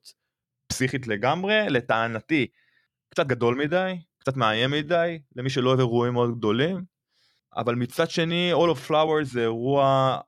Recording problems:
uneven, jittery; strongly; from 0.5 to 9.5 s

